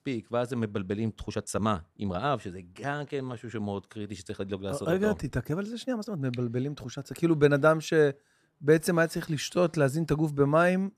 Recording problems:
uneven, jittery; strongly; from 1.5 to 10 s

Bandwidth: 14.5 kHz